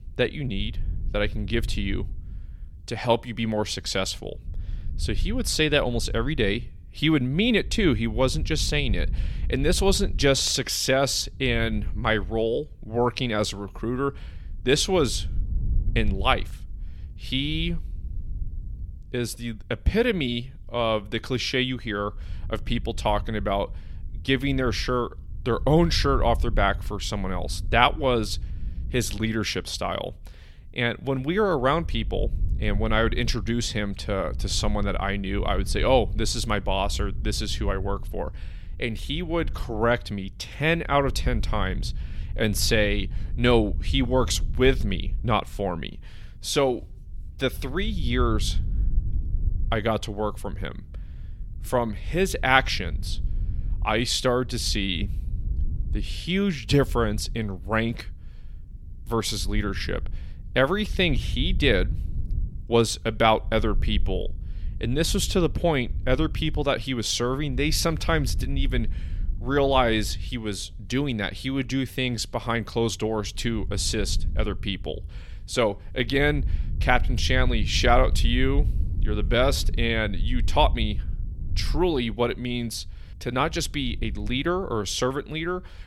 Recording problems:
wind noise on the microphone; occasional gusts; 25 dB below the speech

